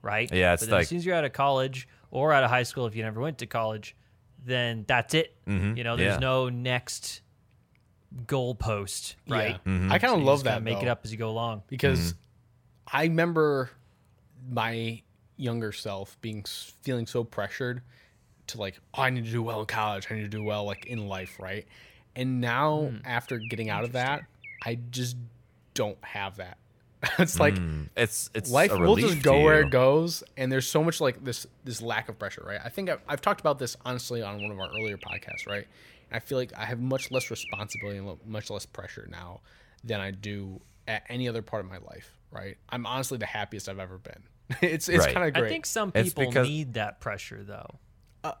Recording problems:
animal sounds; noticeable; throughout; 10 dB below the speech

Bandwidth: 17 kHz